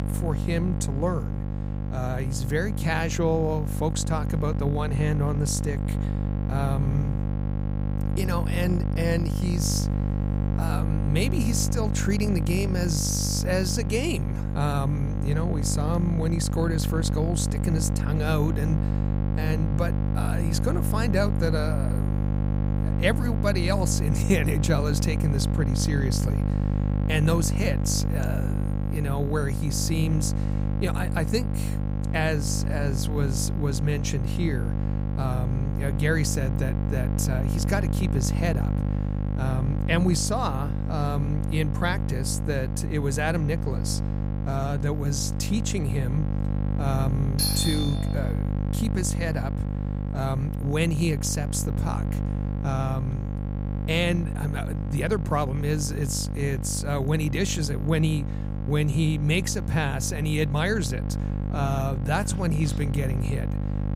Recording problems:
electrical hum; loud; throughout; 50 Hz, 7 dB below the speech
doorbell; loud; at 47 s; peak 3 dB above the speech

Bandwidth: 15.5 kHz